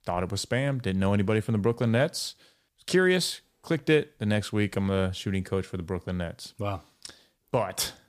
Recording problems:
none

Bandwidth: 15 kHz